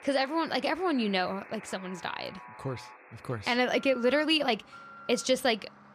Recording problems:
alarms or sirens; noticeable; throughout; 20 dB below the speech

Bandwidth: 14.5 kHz